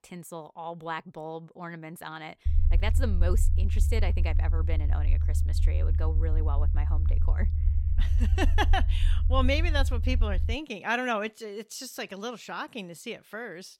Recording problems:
low rumble; noticeable; from 2.5 to 11 s; 15 dB below the speech

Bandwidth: 16 kHz